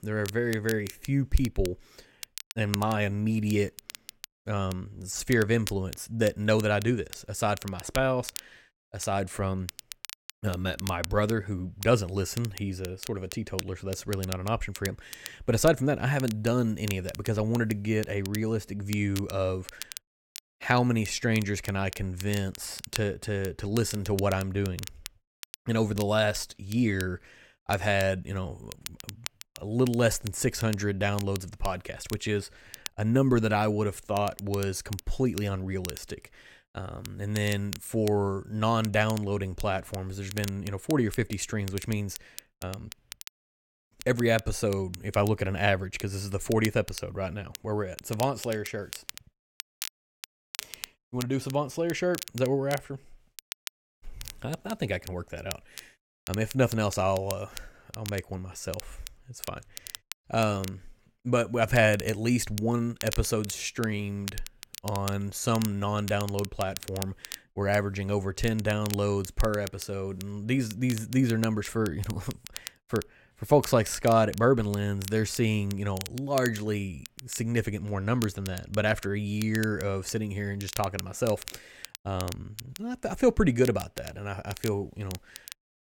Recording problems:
crackle, like an old record; noticeable; 15 dB below the speech

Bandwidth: 16.5 kHz